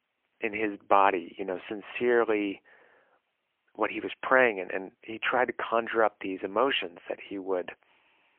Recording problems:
phone-call audio; poor line; nothing above 3 kHz

